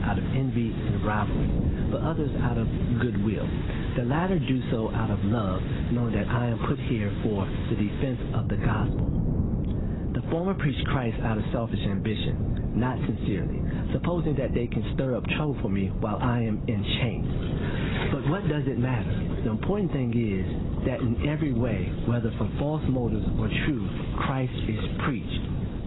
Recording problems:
garbled, watery; badly; nothing above 4 kHz
squashed, flat; heavily, background pumping
wind noise on the microphone; heavy; 8 dB below the speech
rain or running water; noticeable; throughout; 15 dB below the speech

